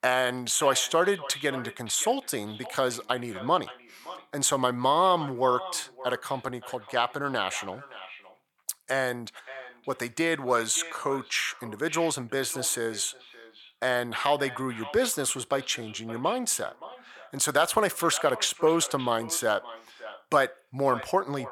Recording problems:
echo of what is said; noticeable; throughout; 570 ms later, 15 dB below the speech

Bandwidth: 19 kHz